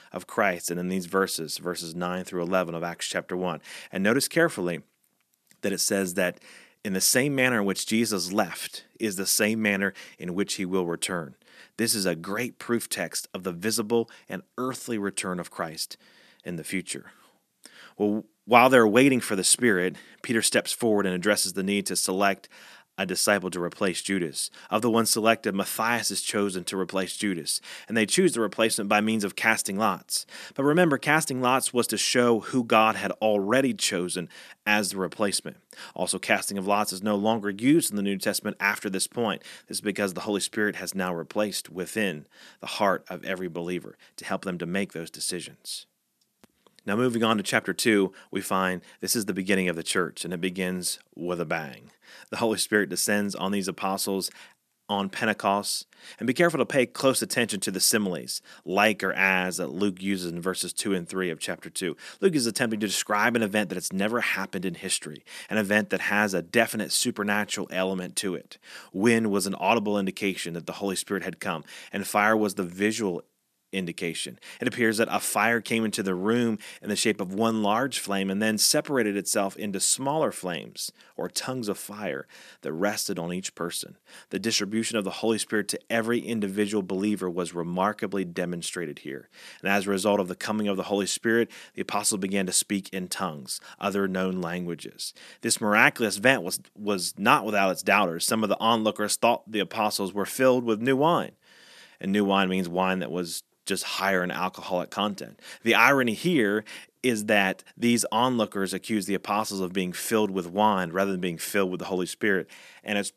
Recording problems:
none

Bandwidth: 14 kHz